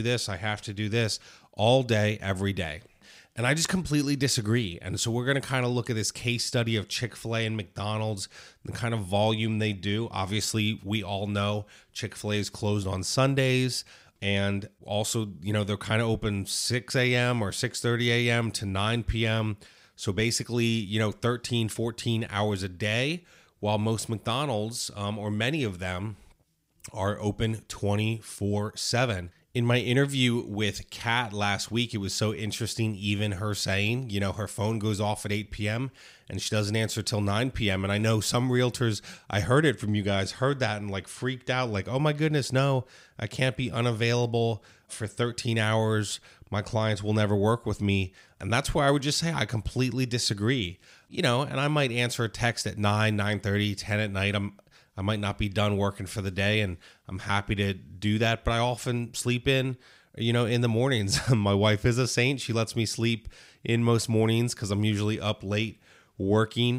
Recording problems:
abrupt cut into speech; at the start and the end

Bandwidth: 15.5 kHz